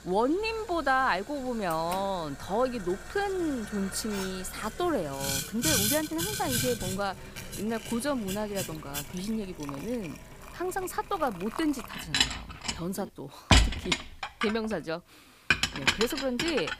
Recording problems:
household noises; very loud; throughout; 1 dB above the speech

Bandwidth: 15 kHz